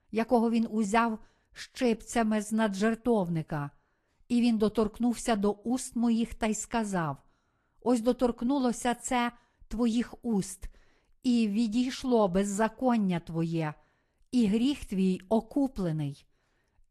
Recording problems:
garbled, watery; slightly

